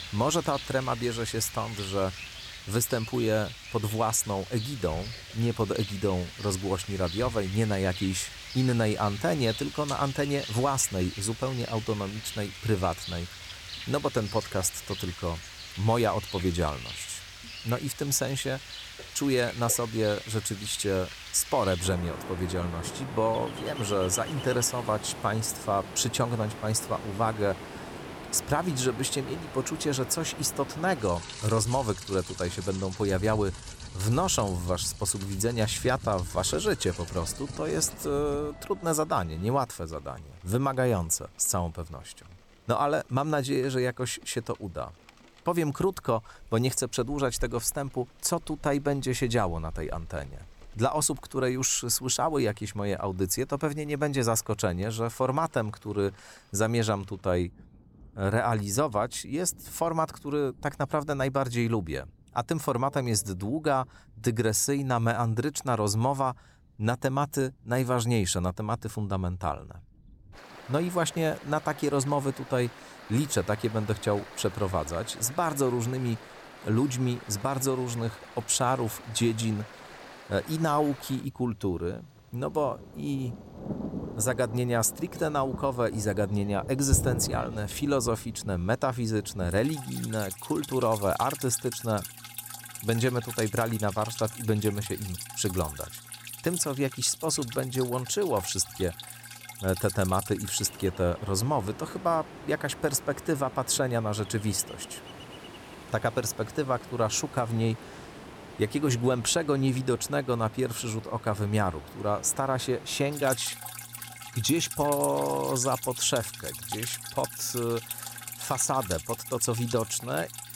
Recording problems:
rain or running water; noticeable; throughout; 10 dB below the speech

